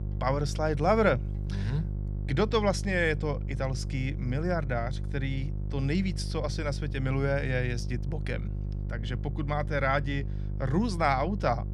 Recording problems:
electrical hum; noticeable; throughout; 50 Hz, 20 dB below the speech

